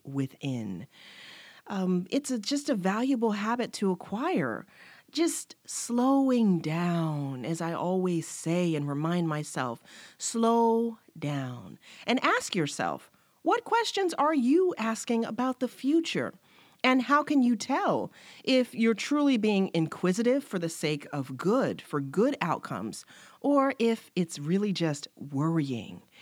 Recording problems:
none

